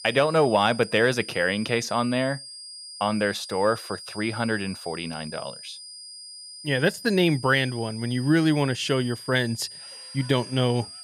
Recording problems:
high-pitched whine; noticeable; throughout; 5 kHz, 15 dB below the speech

